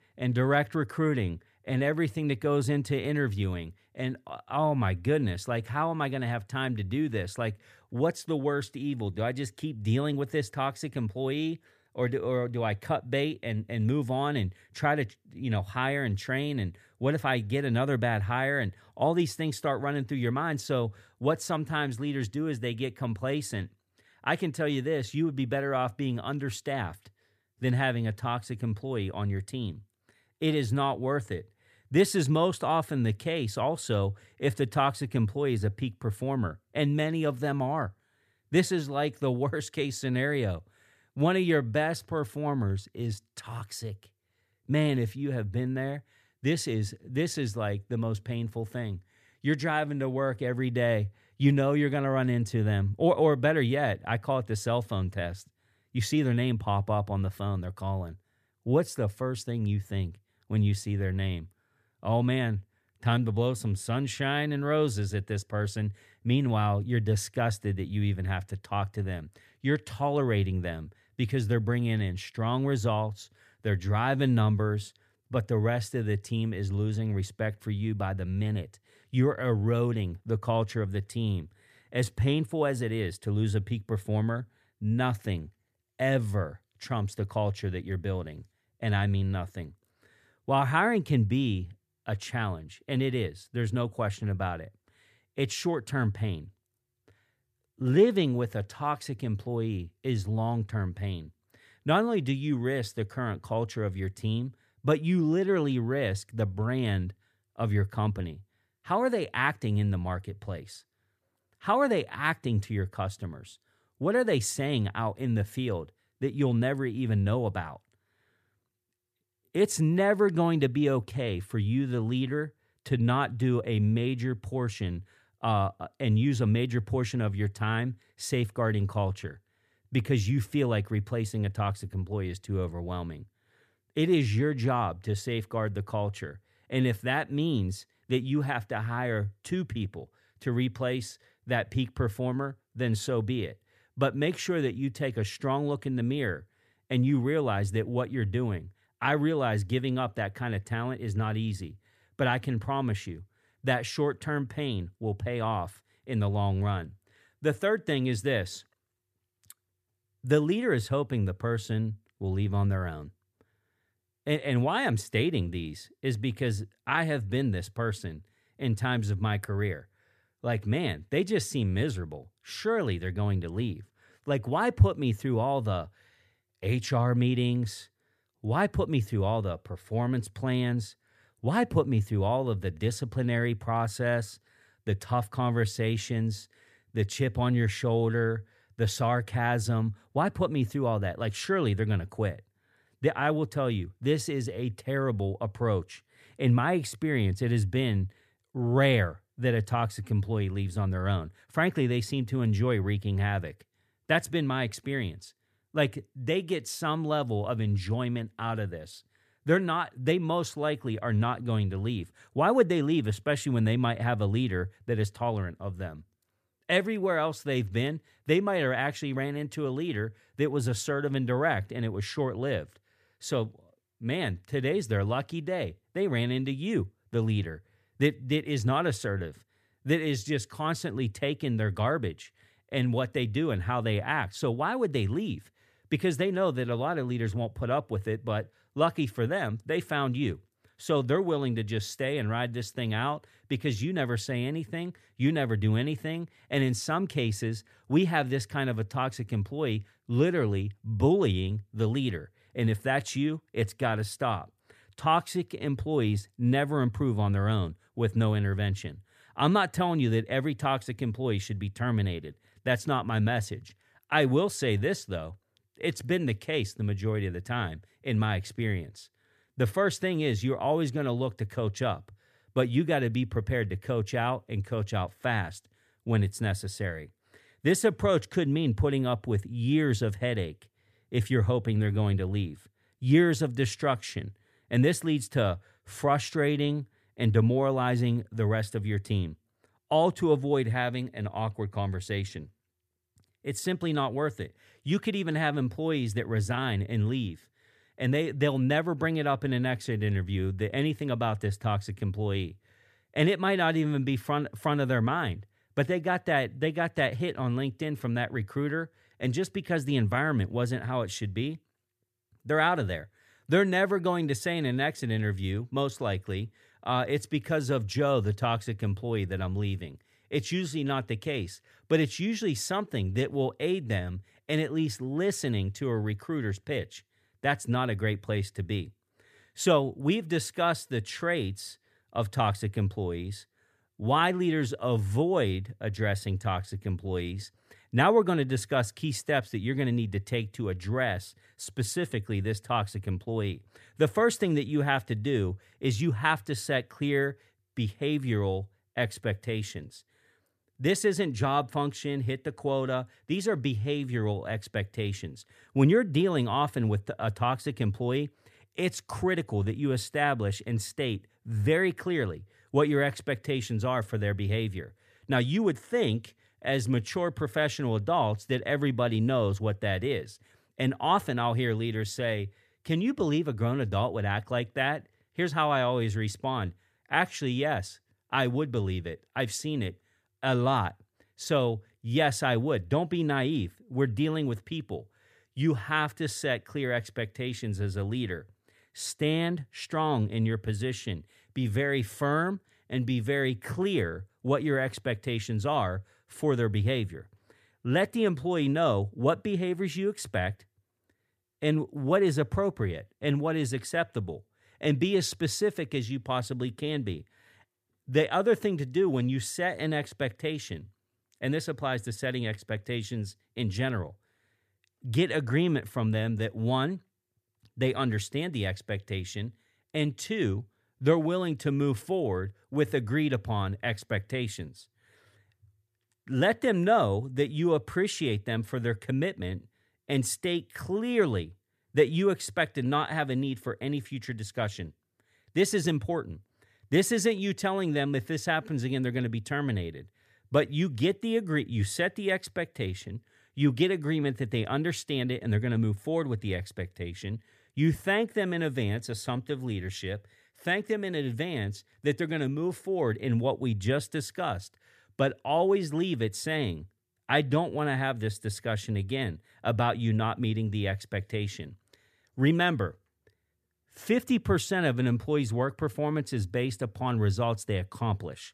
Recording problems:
none

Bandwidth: 14.5 kHz